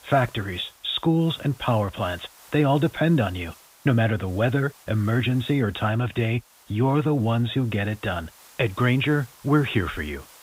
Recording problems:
high frequencies cut off; severe; nothing above 4 kHz
hiss; faint; throughout; 25 dB below the speech

